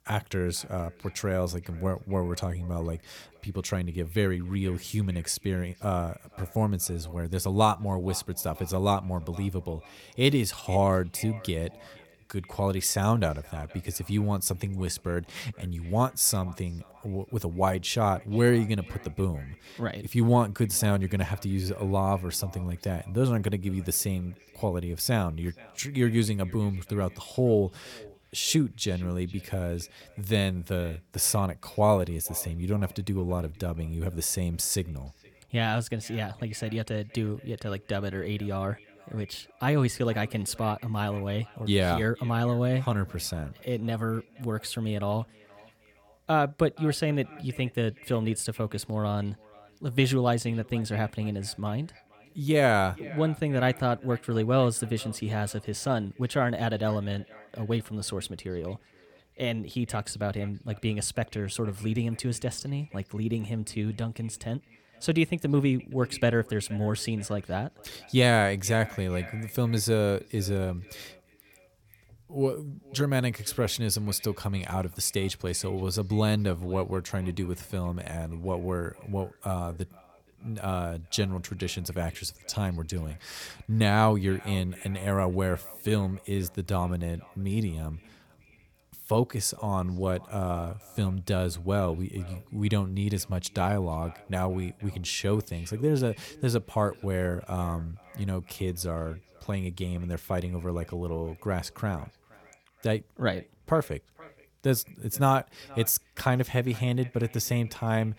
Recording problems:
echo of what is said; faint; throughout; 470 ms later, 25 dB below the speech

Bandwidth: 18 kHz